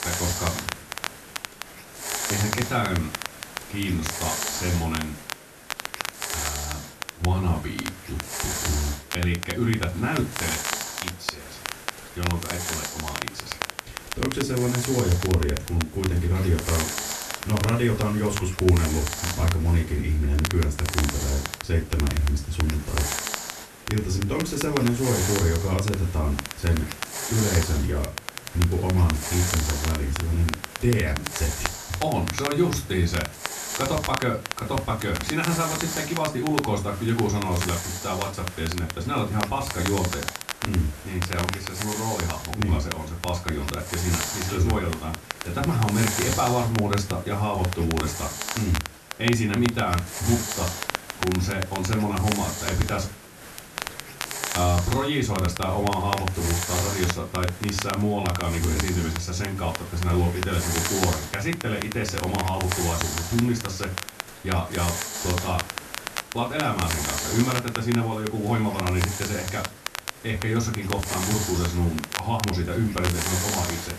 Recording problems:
off-mic speech; far
room echo; very slight; dies away in 0.2 s
hiss; loud; throughout; 7 dB below the speech
crackle, like an old record; loud; 8 dB below the speech
chatter from many people; faint; throughout; 25 dB below the speech

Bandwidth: 13.5 kHz